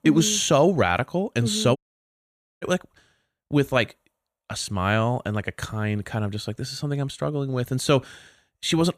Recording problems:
audio cutting out; at 2 s for 1 s

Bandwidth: 15 kHz